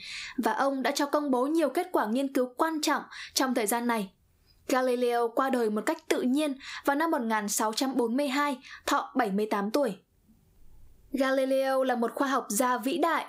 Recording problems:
squashed, flat; somewhat

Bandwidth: 15.5 kHz